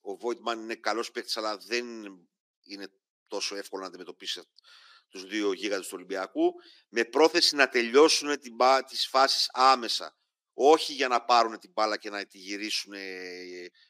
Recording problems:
thin; somewhat; fading below 300 Hz

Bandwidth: 15 kHz